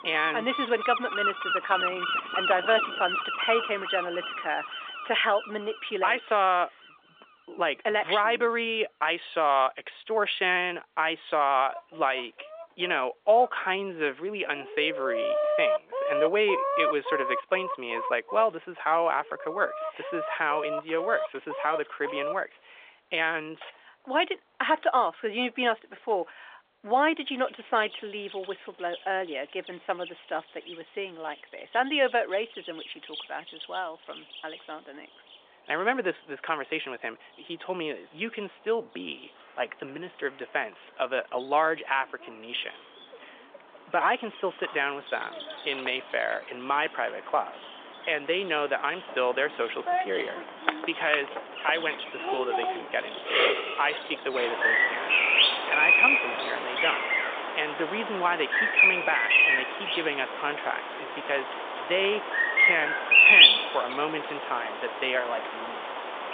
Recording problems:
thin; very; fading below 550 Hz
phone-call audio; nothing above 3.5 kHz
animal sounds; very loud; throughout; 4 dB above the speech

